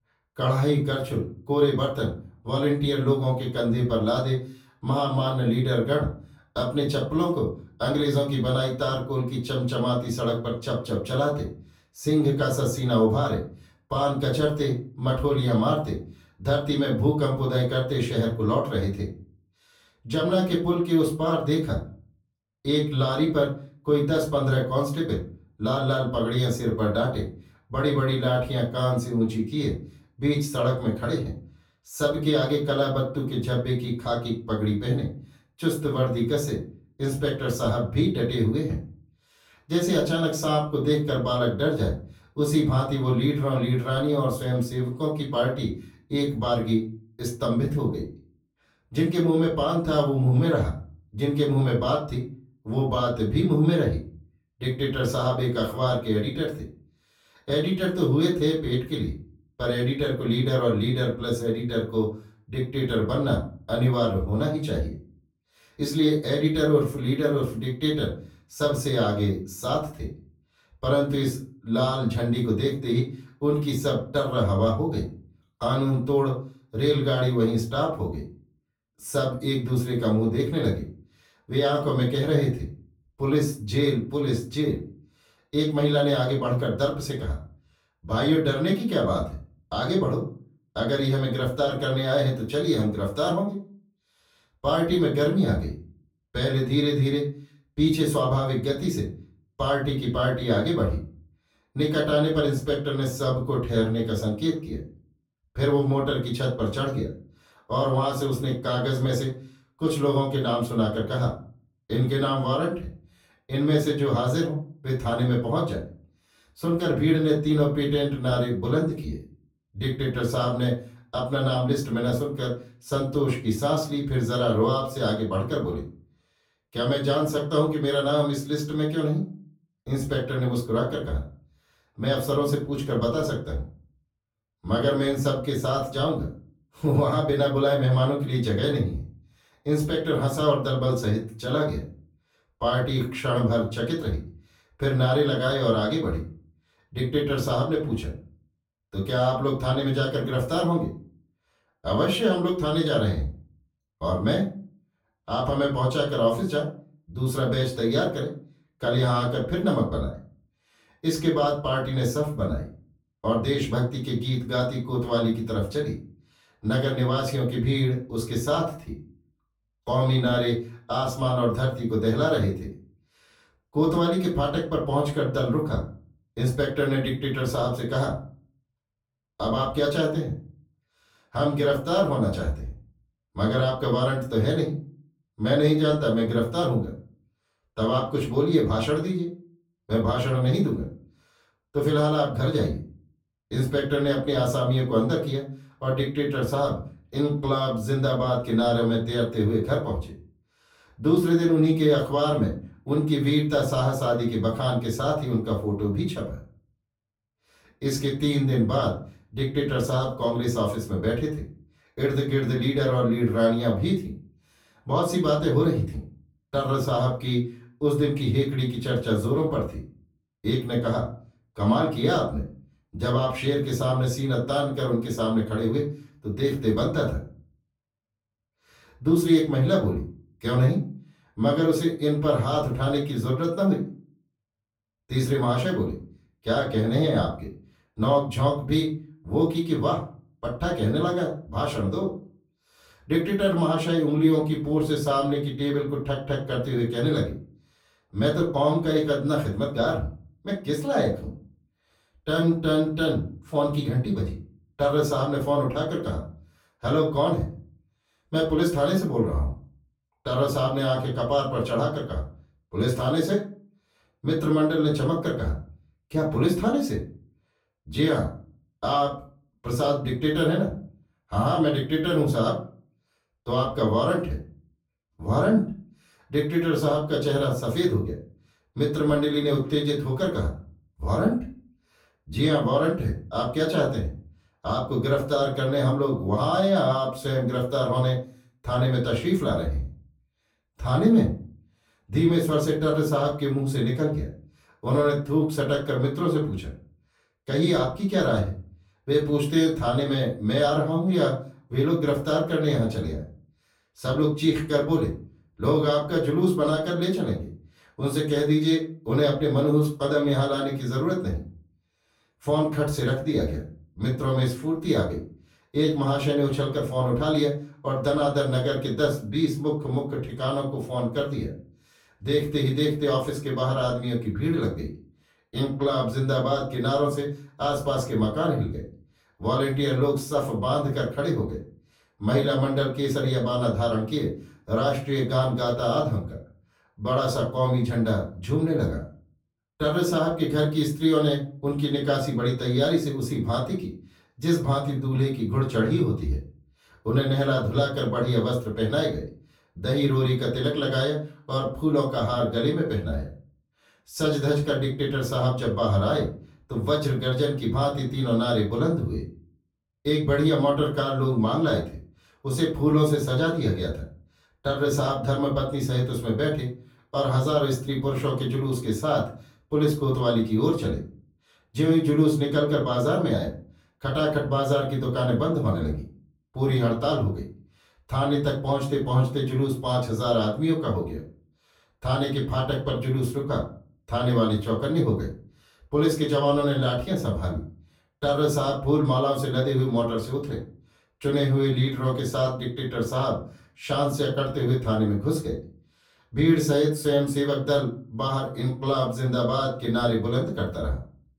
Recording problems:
off-mic speech; far
room echo; slight; dies away in 0.3 s

